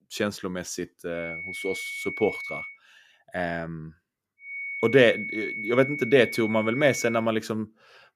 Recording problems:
high-pitched whine; loud; from 1 to 2.5 s and from 4.5 to 7 s; 2 kHz, 7 dB below the speech

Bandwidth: 14.5 kHz